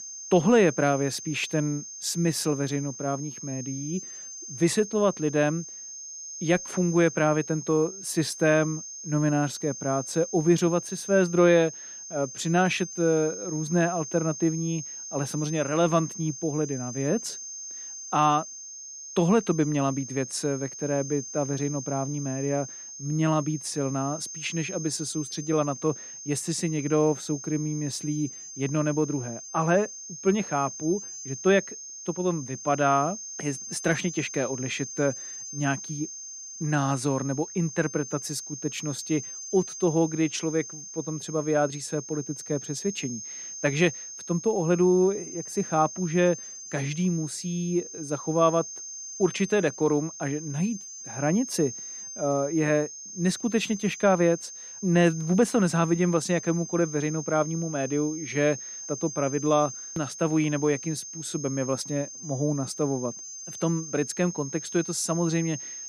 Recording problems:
high-pitched whine; noticeable; throughout; 6.5 kHz, 10 dB below the speech

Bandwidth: 15 kHz